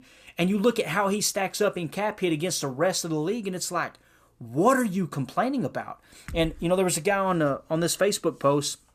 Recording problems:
none

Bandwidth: 14.5 kHz